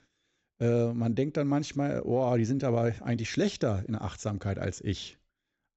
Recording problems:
high frequencies cut off; noticeable; nothing above 7.5 kHz

